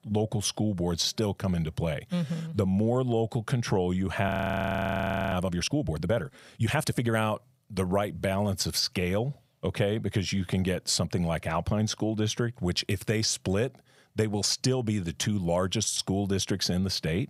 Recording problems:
audio freezing; at 4.5 s for 1 s

